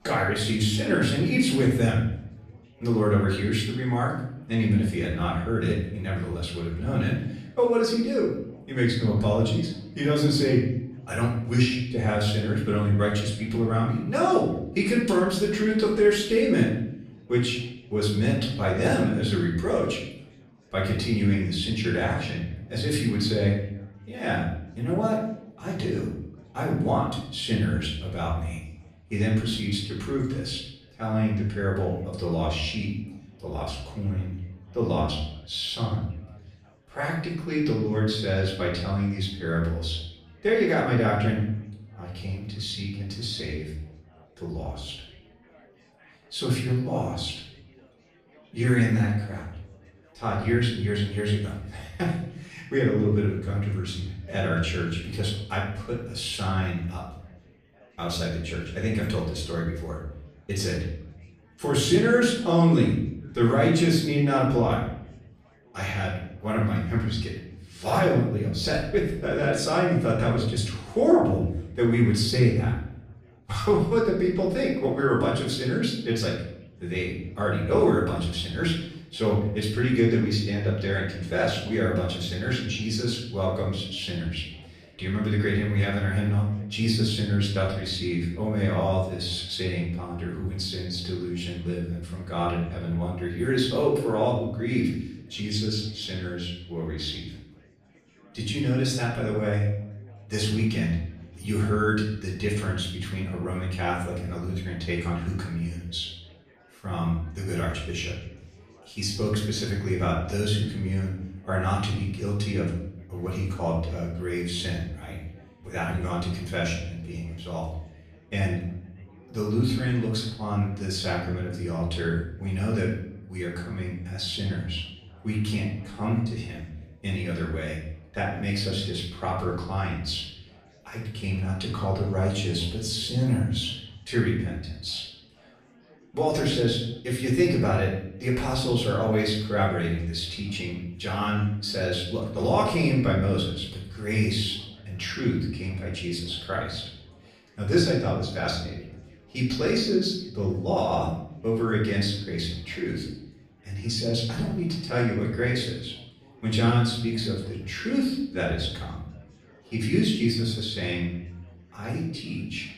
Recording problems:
off-mic speech; far
room echo; noticeable; dies away in 0.7 s
chatter from many people; faint; throughout; 30 dB below the speech

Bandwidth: 14 kHz